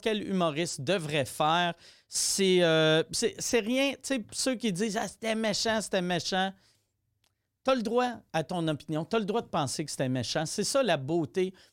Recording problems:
none

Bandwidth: 16.5 kHz